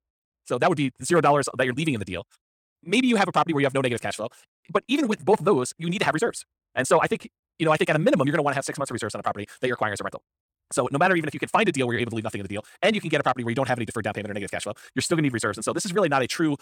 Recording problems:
wrong speed, natural pitch; too fast; 1.7 times normal speed

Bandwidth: 17 kHz